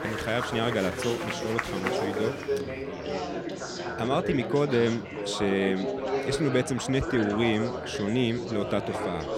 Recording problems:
chatter from many people; loud; throughout; 4 dB below the speech

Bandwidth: 16.5 kHz